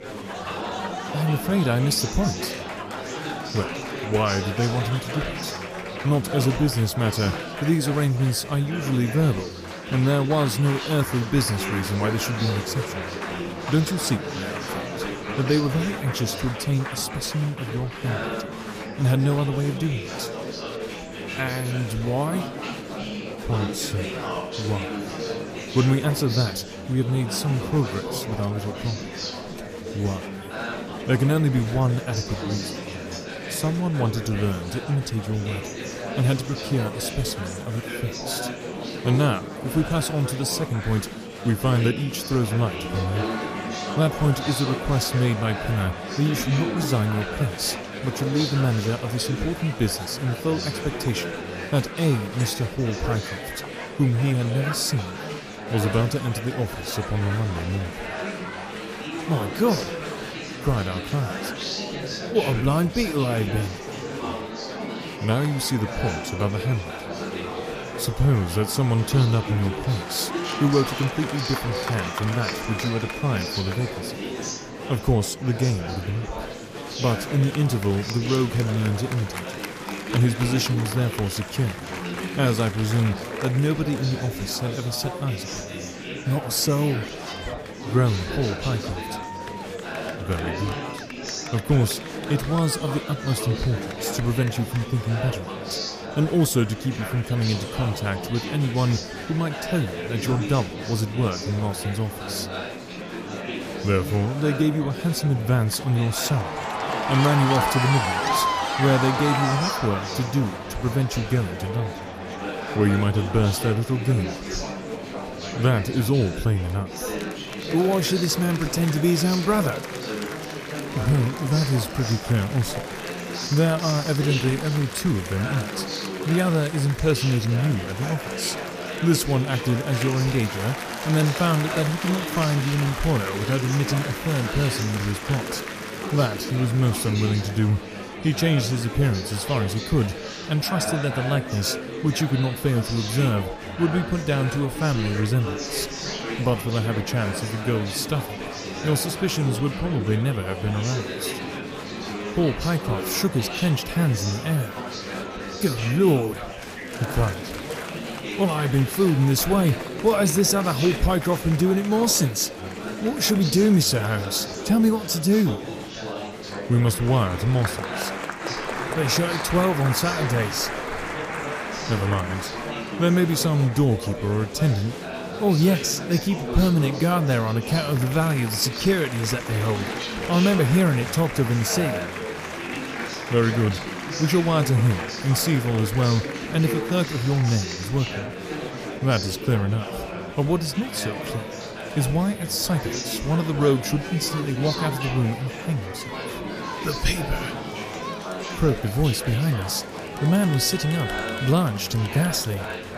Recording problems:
murmuring crowd; loud; throughout; 7 dB below the speech

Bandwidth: 14.5 kHz